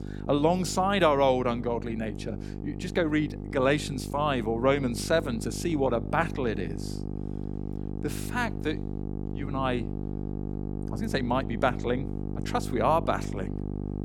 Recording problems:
electrical hum; noticeable; throughout; 50 Hz, 15 dB below the speech

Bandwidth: 18 kHz